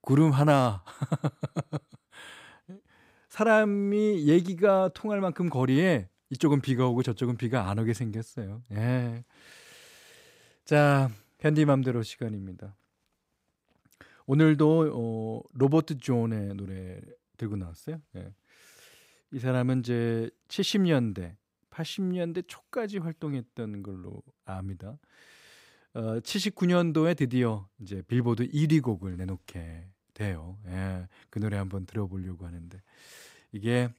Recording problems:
none

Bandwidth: 15.5 kHz